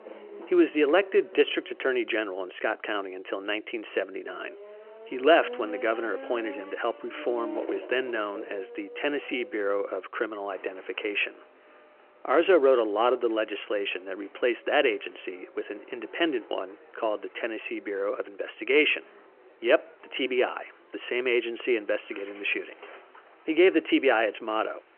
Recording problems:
phone-call audio; nothing above 3 kHz
traffic noise; noticeable; throughout; 20 dB below the speech

